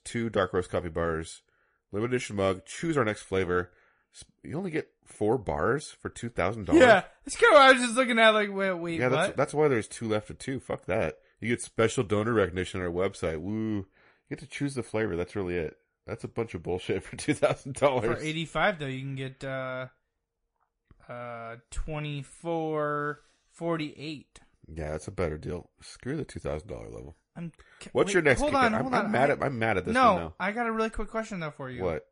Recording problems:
garbled, watery; slightly; nothing above 10.5 kHz

